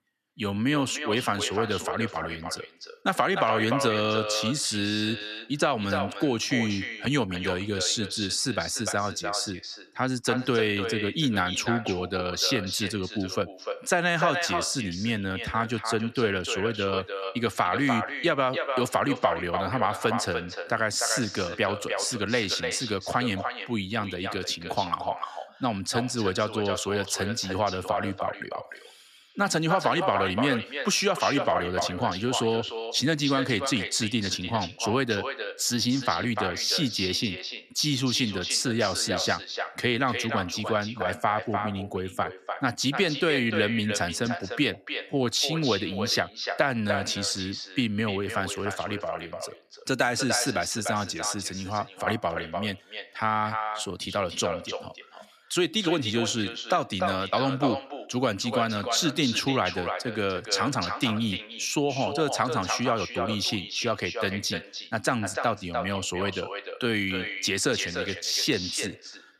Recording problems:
echo of what is said; strong; throughout; 300 ms later, 7 dB below the speech
uneven, jittery; slightly; from 10 s to 1:08

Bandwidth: 14.5 kHz